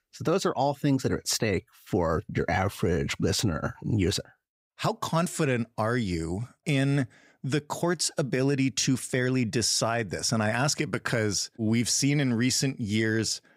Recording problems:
none

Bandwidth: 15.5 kHz